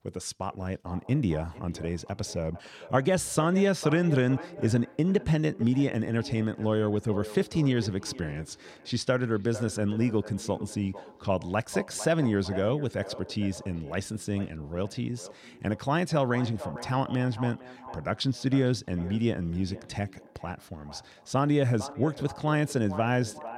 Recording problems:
echo of what is said; noticeable; throughout; 450 ms later, 15 dB below the speech

